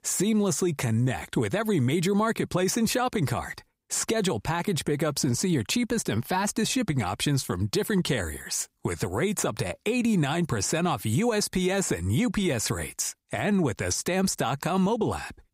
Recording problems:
squashed, flat; somewhat

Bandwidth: 15.5 kHz